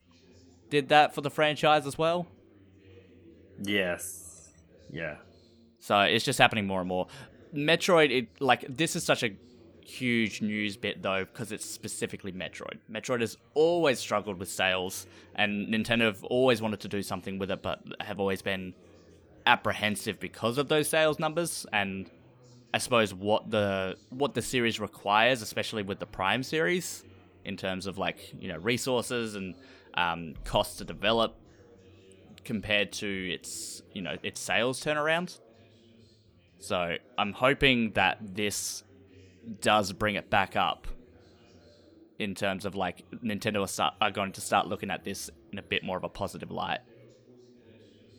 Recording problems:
background chatter; faint; throughout; 3 voices, 30 dB below the speech

